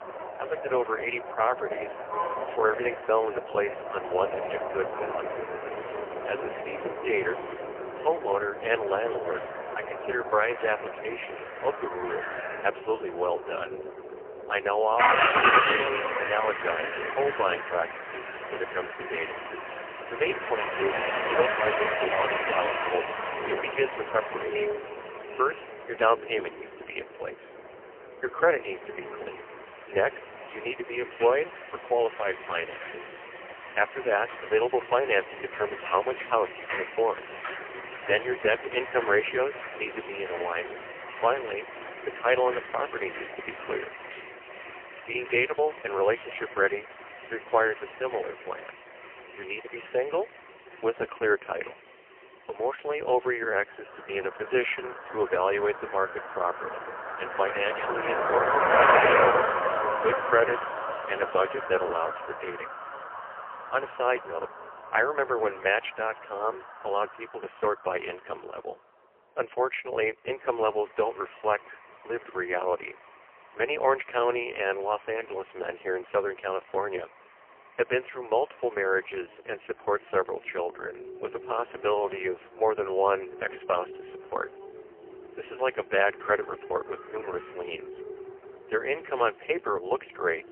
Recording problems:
phone-call audio; poor line; nothing above 3 kHz
traffic noise; loud; throughout; 2 dB below the speech

